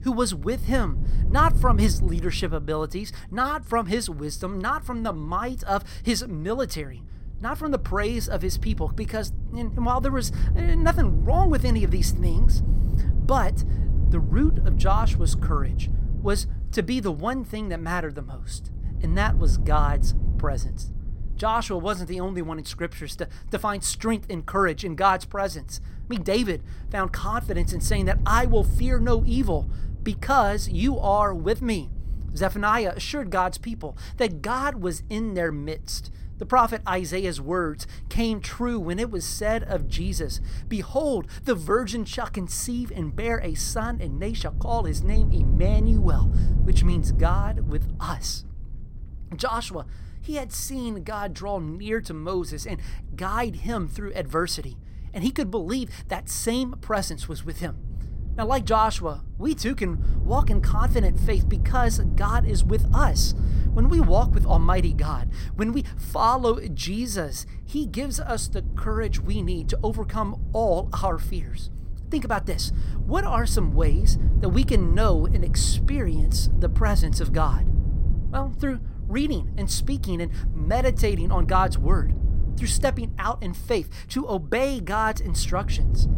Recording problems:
wind noise on the microphone; occasional gusts; 15 dB below the speech

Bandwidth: 16.5 kHz